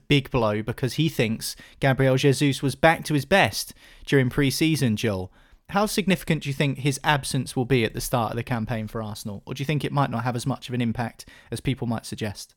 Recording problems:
none

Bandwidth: 18 kHz